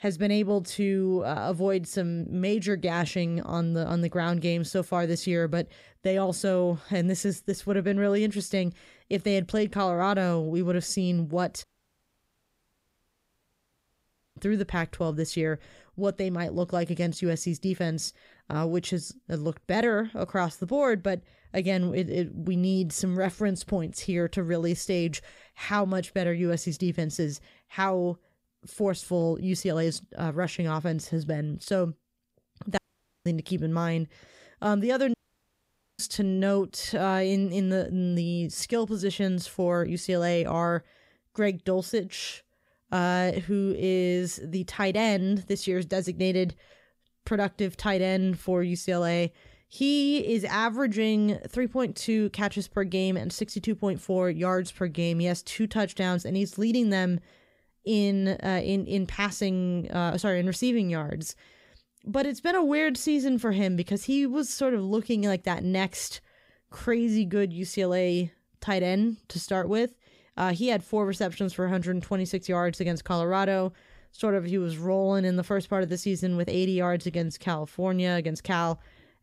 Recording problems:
audio cutting out; at 12 s for 2.5 s, at 33 s and at 35 s for 1 s

